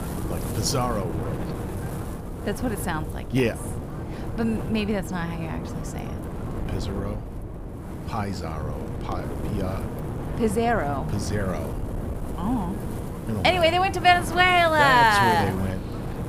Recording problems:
wind noise on the microphone; occasional gusts; 15 dB below the speech

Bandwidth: 15 kHz